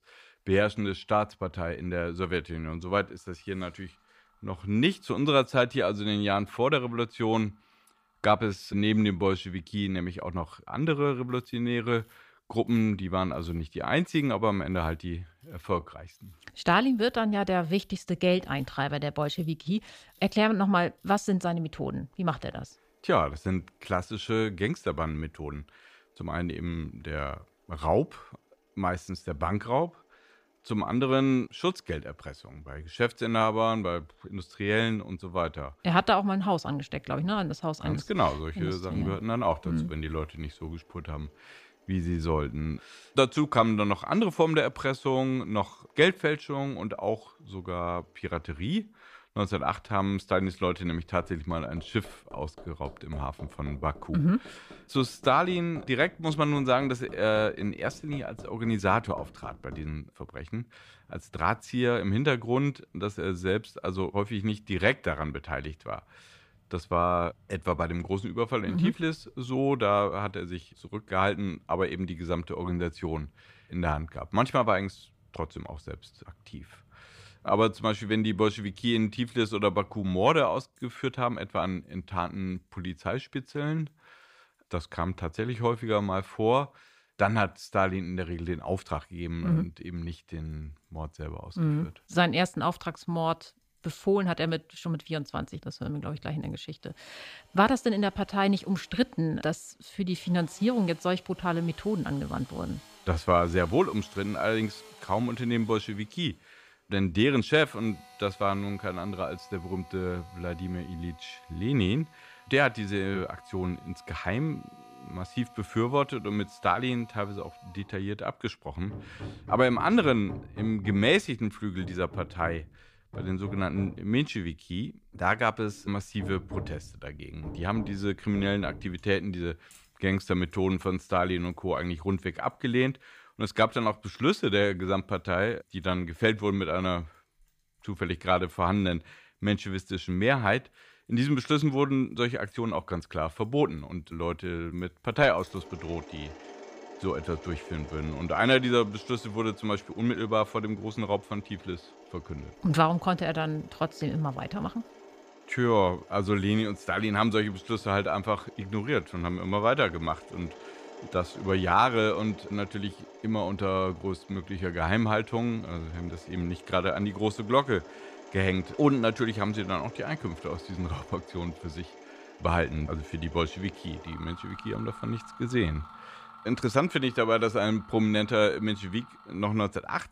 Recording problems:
machinery noise; noticeable; throughout; 20 dB below the speech

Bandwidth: 15 kHz